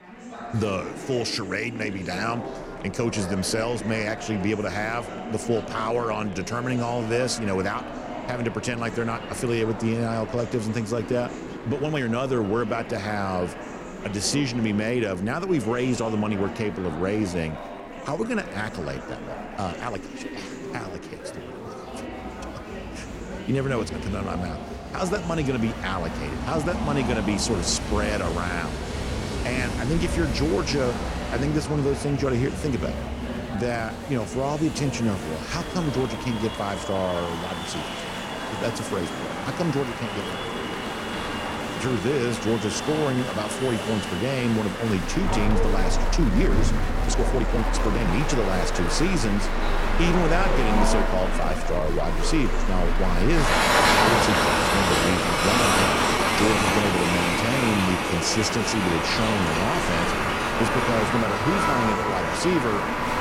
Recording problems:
train or aircraft noise; very loud; throughout; as loud as the speech
chatter from many people; loud; throughout; 8 dB below the speech
uneven, jittery; strongly; from 11 to 57 s

